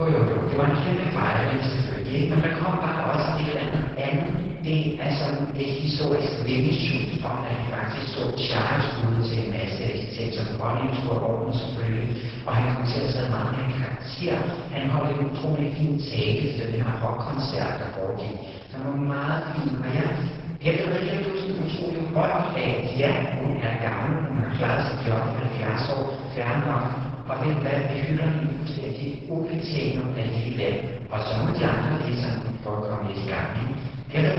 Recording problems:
room echo; strong; dies away in 1.4 s
off-mic speech; far
garbled, watery; badly; nothing above 5.5 kHz
echo of what is said; faint; throughout; 470 ms later, 25 dB below the speech
abrupt cut into speech; at the start and the end

